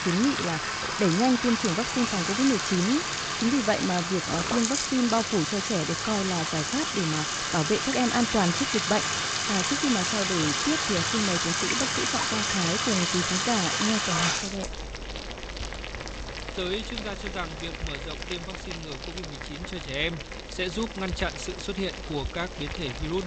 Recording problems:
high frequencies cut off; noticeable; nothing above 8 kHz
household noises; very loud; throughout; 1 dB above the speech
train or aircraft noise; noticeable; throughout; 20 dB below the speech
hiss; faint; from 7.5 s on; 25 dB below the speech
abrupt cut into speech; at the end

